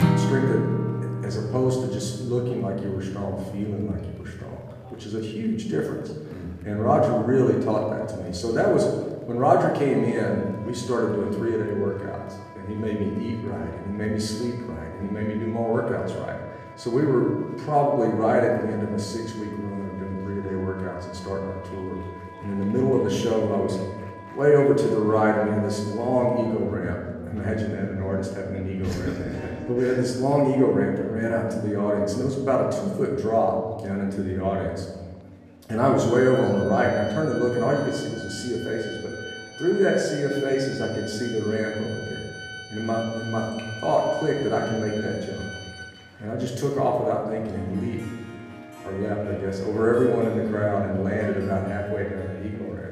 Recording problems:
off-mic speech; far
room echo; noticeable; dies away in 1.2 s
background music; noticeable; throughout; 15 dB below the speech
murmuring crowd; faint; throughout; 30 dB below the speech

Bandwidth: 15 kHz